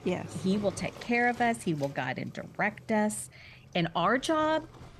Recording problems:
rain or running water; noticeable; throughout; 20 dB below the speech

